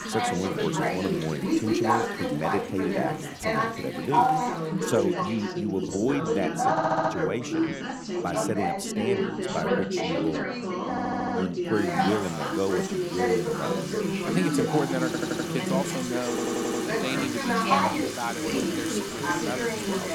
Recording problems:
chatter from many people; very loud; throughout; 4 dB above the speech
household noises; loud; throughout; 7 dB below the speech
audio stuttering; 4 times, first at 6.5 s

